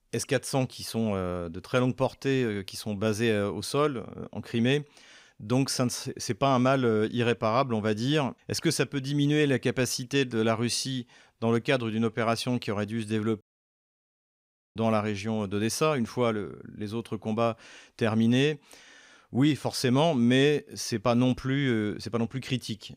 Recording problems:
audio cutting out; at 13 s for 1.5 s

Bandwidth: 15.5 kHz